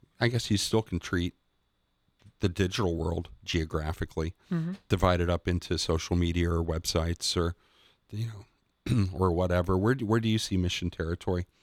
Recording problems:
none

